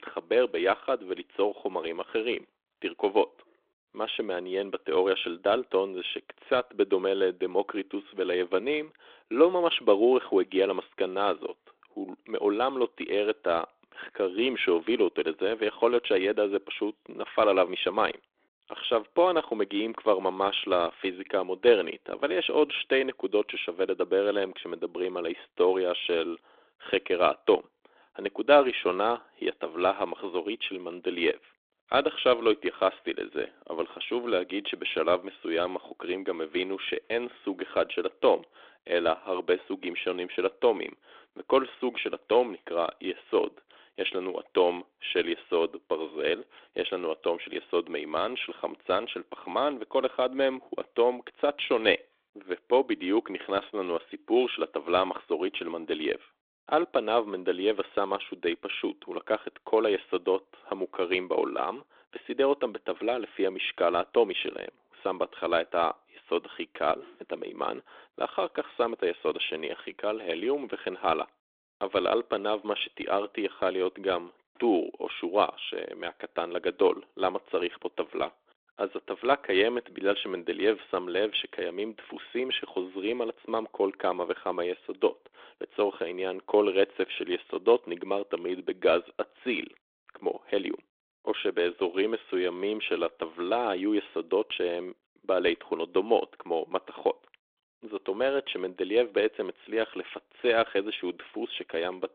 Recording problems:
phone-call audio; nothing above 3.5 kHz

